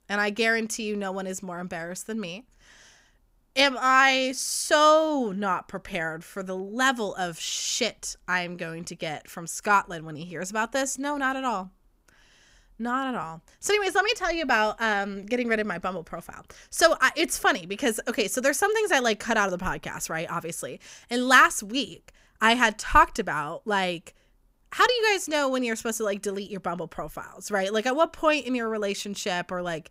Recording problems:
none

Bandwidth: 15.5 kHz